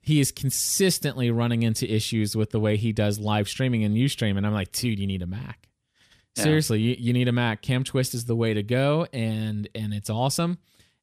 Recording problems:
none

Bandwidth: 14.5 kHz